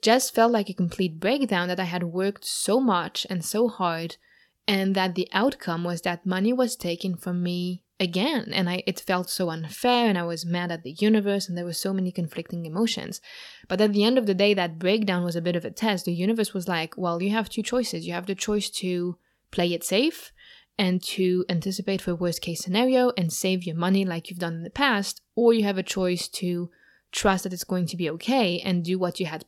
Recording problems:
none

